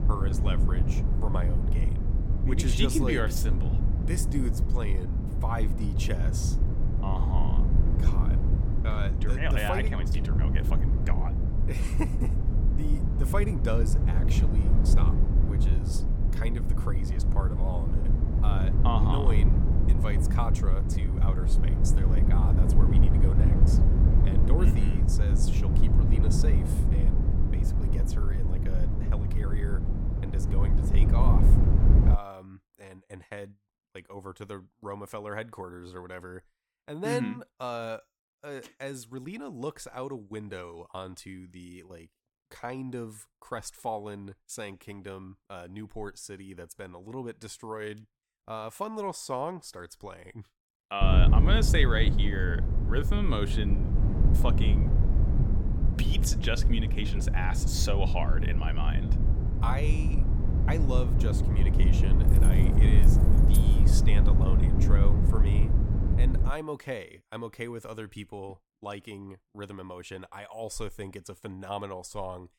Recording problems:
low rumble; loud; until 32 s and from 51 s to 1:07; 3 dB below the speech
jangling keys; noticeable; from 1:02 to 1:04; peak 5 dB below the speech

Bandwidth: 17 kHz